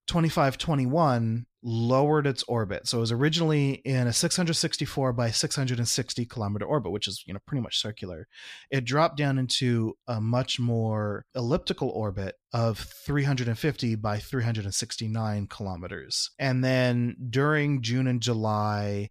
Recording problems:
none

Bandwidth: 14.5 kHz